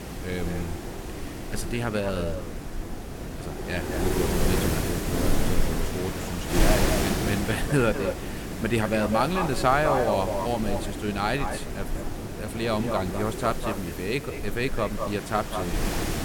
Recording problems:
echo of what is said; strong; throughout; 200 ms later, 7 dB below the speech
wind noise on the microphone; heavy; 5 dB below the speech

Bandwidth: 17.5 kHz